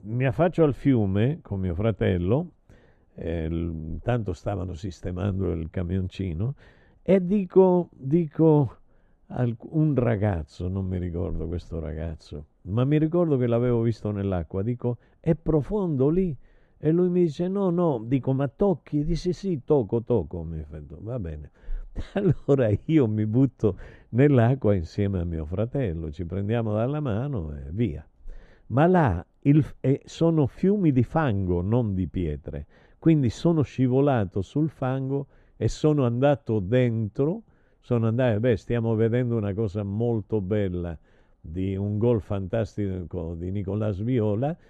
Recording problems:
muffled; very; fading above 1 kHz

